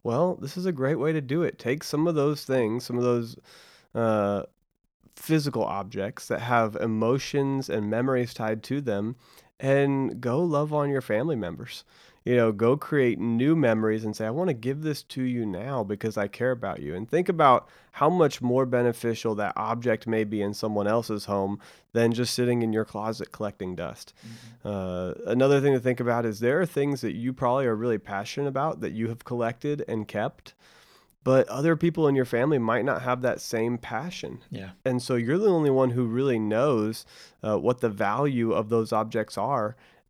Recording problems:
none

